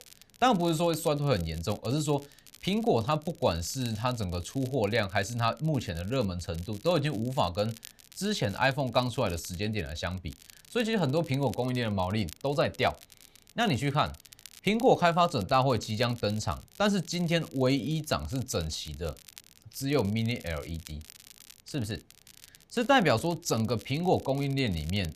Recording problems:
crackle, like an old record; faint; 20 dB below the speech

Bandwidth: 14.5 kHz